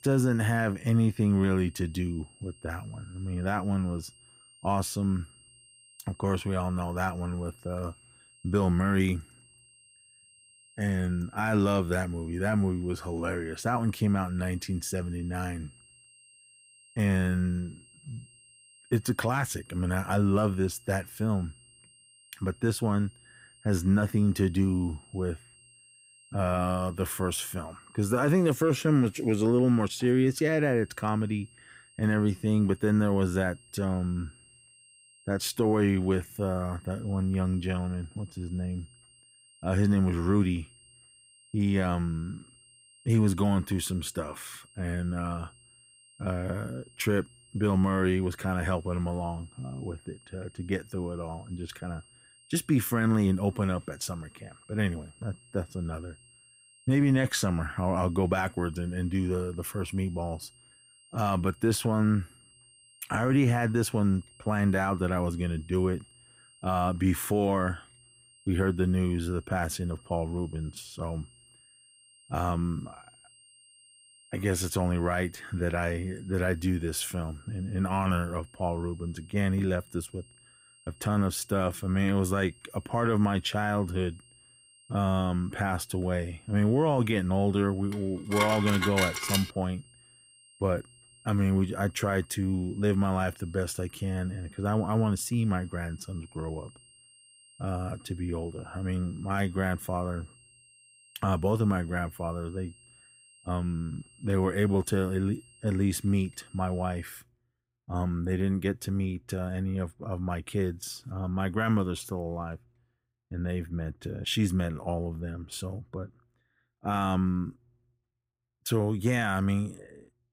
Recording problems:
high-pitched whine; faint; until 1:47; 3 kHz, 25 dB below the speech
clattering dishes; loud; from 1:28 to 1:29; peak 1 dB above the speech

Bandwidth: 15.5 kHz